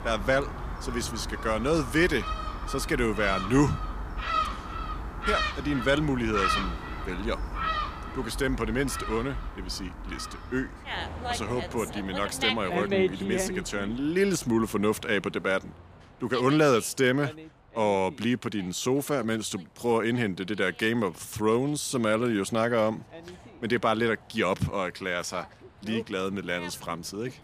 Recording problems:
animal sounds; loud; throughout; 5 dB below the speech

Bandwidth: 15 kHz